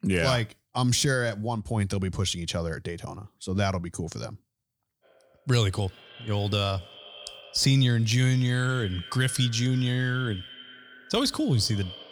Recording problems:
echo of what is said; noticeable; from 5 s on; 160 ms later, 15 dB below the speech

